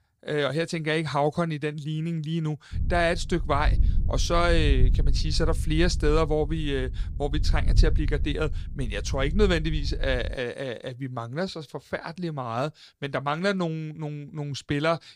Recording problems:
wind noise on the microphone; occasional gusts; from 2.5 to 10 s; 20 dB below the speech

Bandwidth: 15 kHz